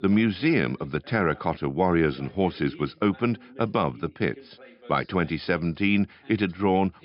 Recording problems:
high frequencies cut off; noticeable; nothing above 5.5 kHz
voice in the background; faint; throughout; 25 dB below the speech

